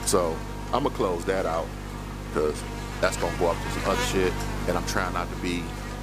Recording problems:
electrical hum; loud; throughout; 50 Hz, 6 dB below the speech

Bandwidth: 15 kHz